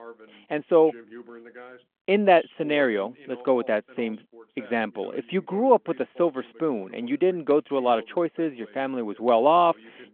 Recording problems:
phone-call audio
voice in the background; faint; throughout; 25 dB below the speech

